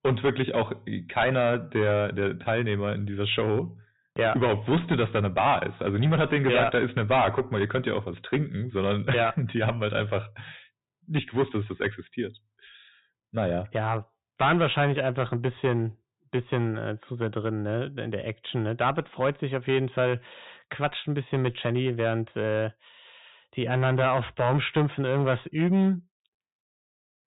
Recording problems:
distortion; heavy; 5% of the sound clipped
high frequencies cut off; severe; nothing above 4 kHz

